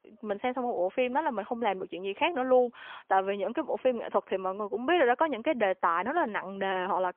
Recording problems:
phone-call audio; poor line; nothing above 3 kHz

